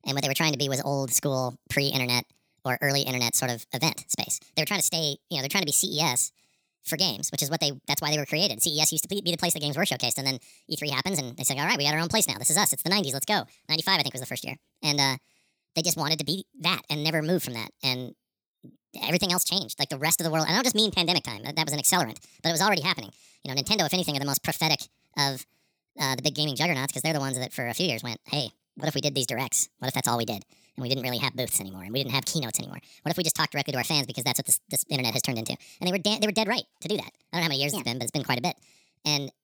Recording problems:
wrong speed and pitch; too fast and too high; 1.5 times normal speed

